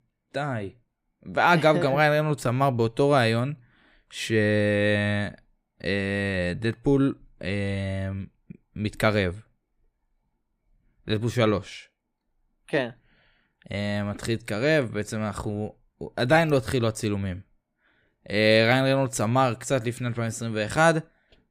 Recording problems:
none

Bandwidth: 15.5 kHz